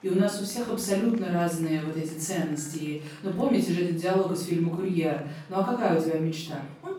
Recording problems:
off-mic speech; far
room echo; noticeable; dies away in 0.5 s
murmuring crowd; faint; throughout; 25 dB below the speech

